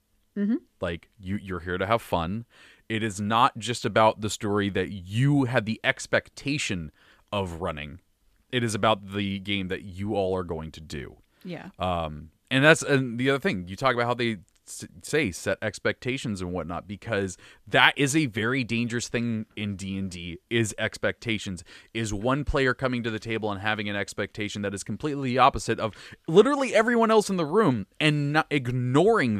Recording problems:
abrupt cut into speech; at the end

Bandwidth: 14.5 kHz